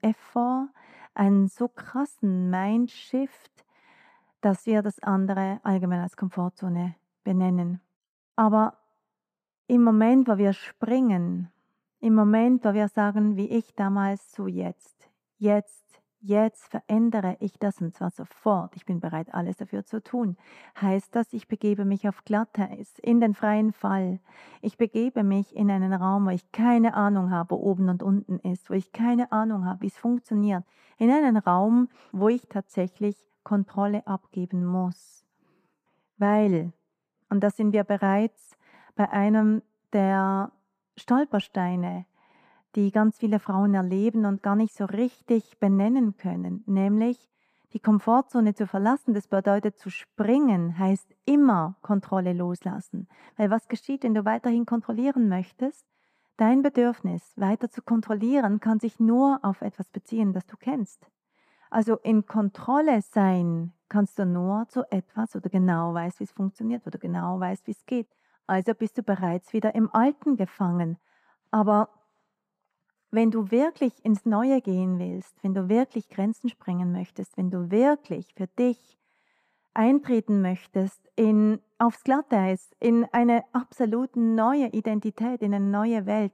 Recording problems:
muffled; slightly; fading above 2 kHz

